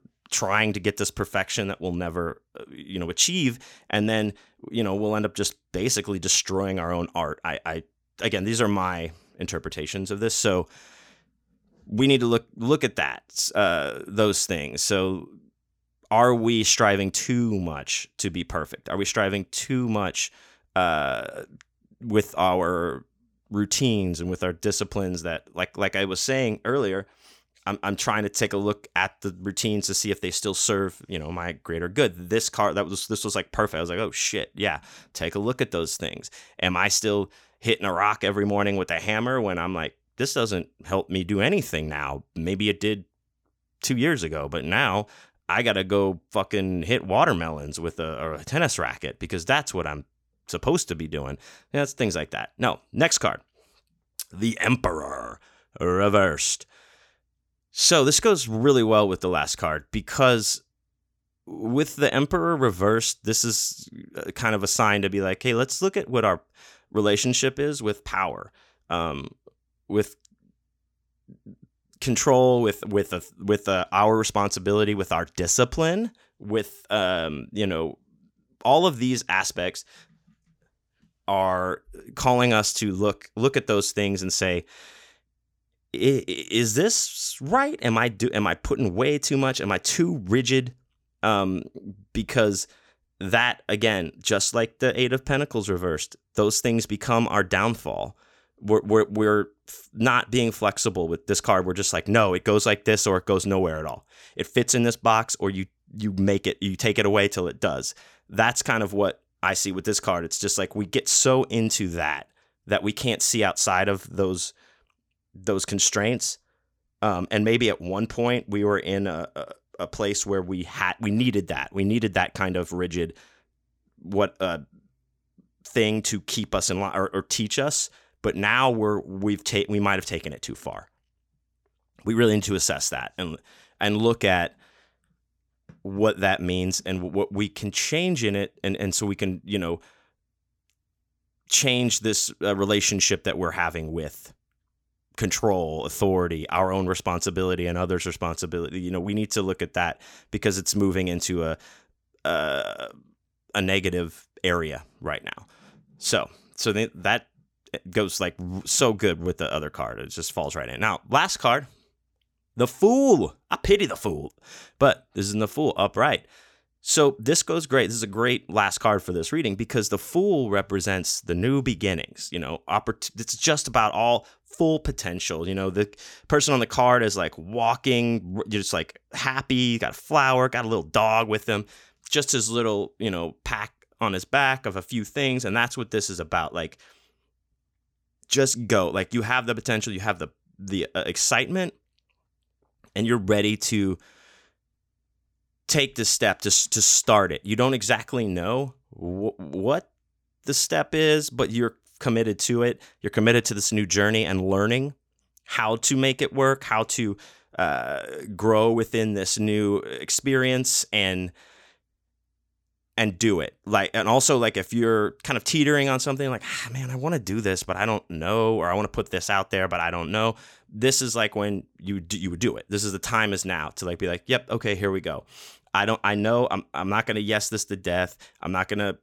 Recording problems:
none

